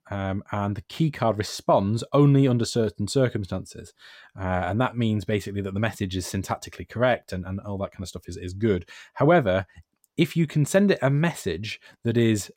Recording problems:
none

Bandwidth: 16 kHz